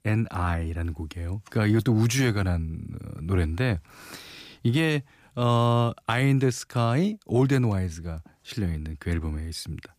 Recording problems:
none

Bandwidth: 15 kHz